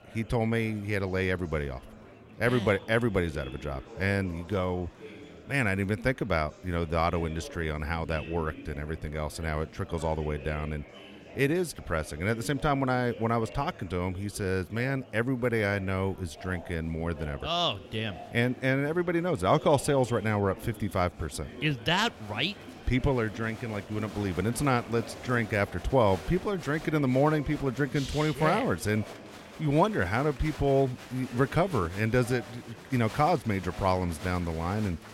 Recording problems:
murmuring crowd; noticeable; throughout; 15 dB below the speech

